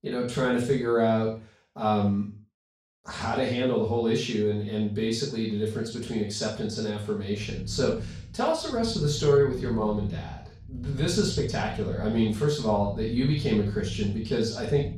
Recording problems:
room echo; strong; dies away in 0.4 s
off-mic speech; far
low rumble; faint; from 7.5 s on; 20 dB below the speech

